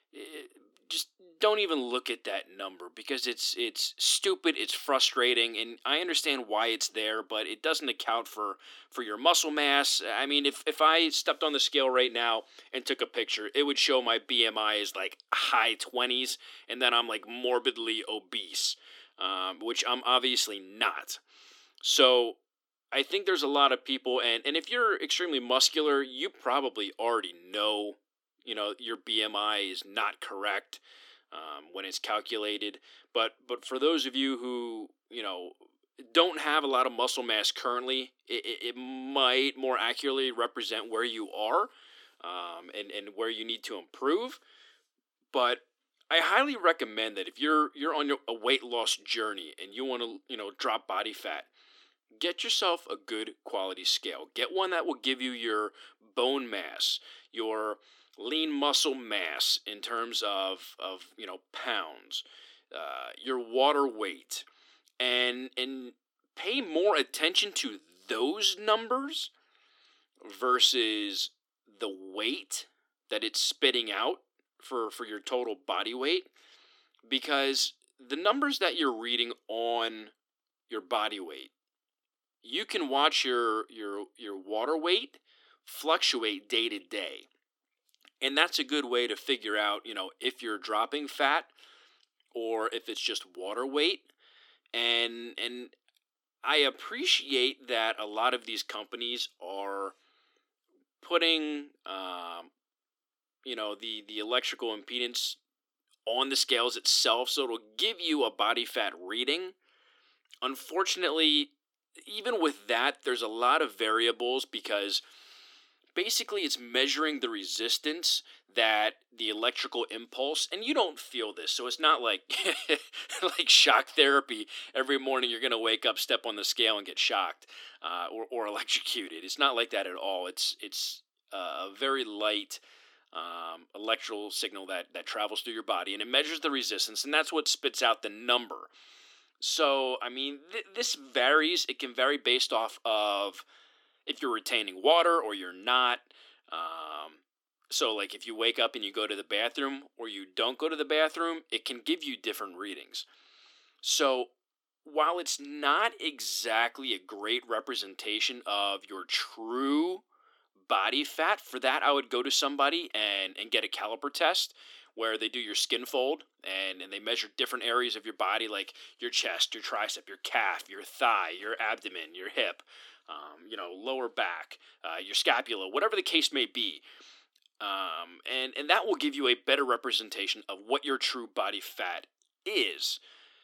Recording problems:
thin; somewhat; fading below 300 Hz

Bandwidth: 17.5 kHz